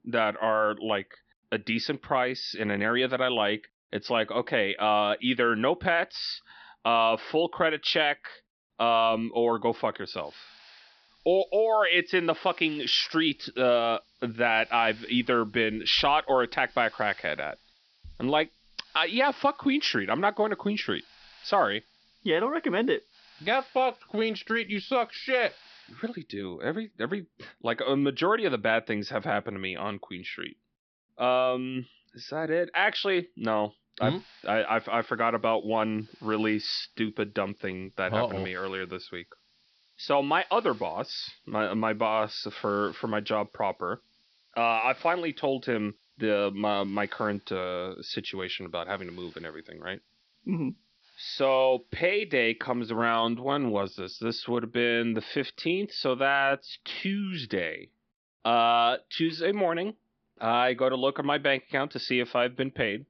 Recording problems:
high frequencies cut off; noticeable; nothing above 5.5 kHz
hiss; faint; from 10 to 26 s and from 34 to 53 s; 30 dB below the speech

